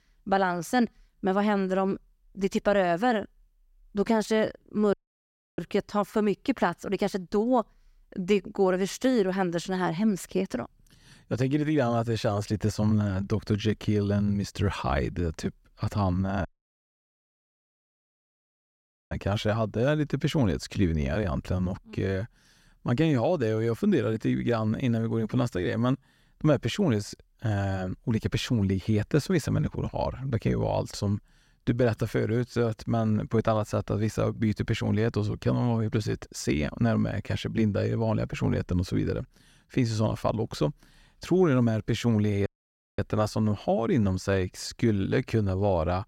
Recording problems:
audio cutting out; at 5 s for 0.5 s, at 16 s for 2.5 s and at 42 s for 0.5 s

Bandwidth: 16 kHz